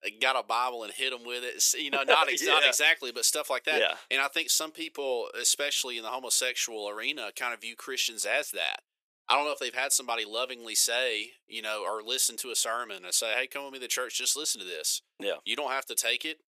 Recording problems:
thin; very; fading below 450 Hz

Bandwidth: 14.5 kHz